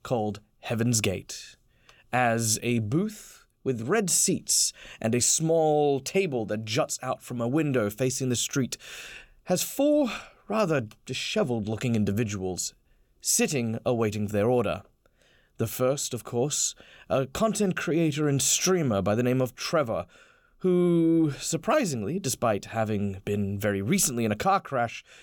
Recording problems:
none

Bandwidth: 17 kHz